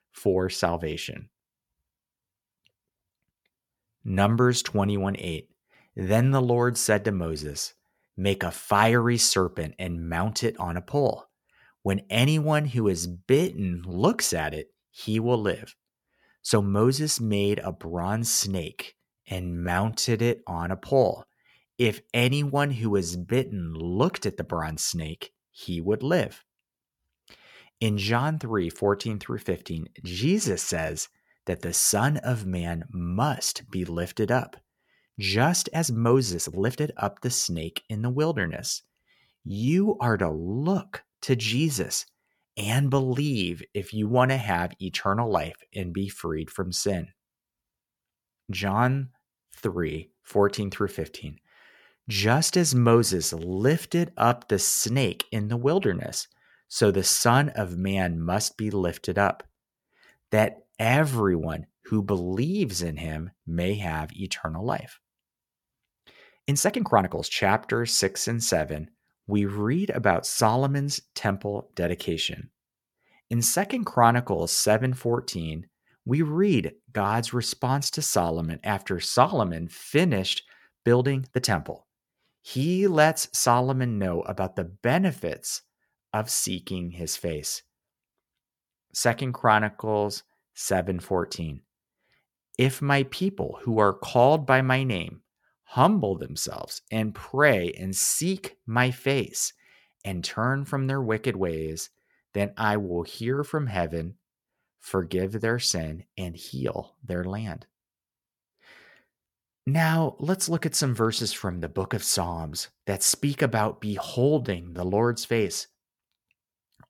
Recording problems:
uneven, jittery; strongly; from 13 s to 1:55

